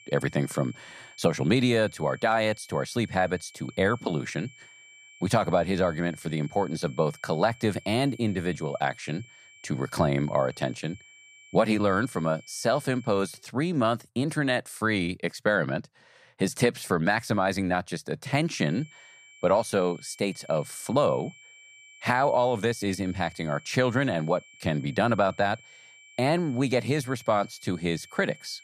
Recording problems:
high-pitched whine; faint; until 13 s and from 19 s on; 2.5 kHz, 25 dB below the speech

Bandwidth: 14.5 kHz